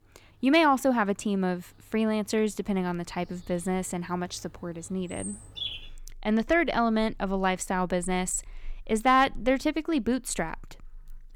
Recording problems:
animal sounds; noticeable; throughout; 20 dB below the speech

